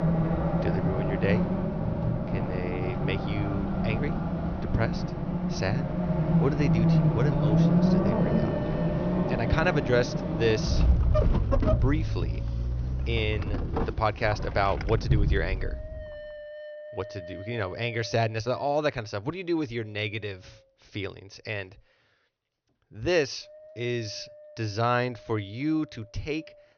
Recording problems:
high frequencies cut off; noticeable; nothing above 6 kHz
traffic noise; very loud; until 16 s; 3 dB above the speech
wind noise on the microphone; occasional gusts; 15 dB below the speech

